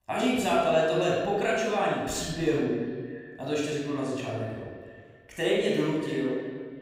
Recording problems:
room echo; strong; dies away in 1.2 s
off-mic speech; far
echo of what is said; noticeable; throughout; 320 ms later, 15 dB below the speech

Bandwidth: 15.5 kHz